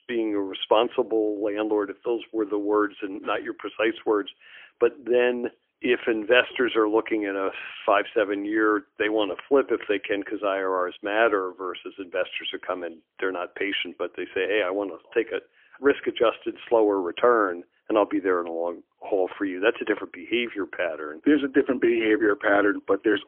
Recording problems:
phone-call audio; poor line; nothing above 3.5 kHz

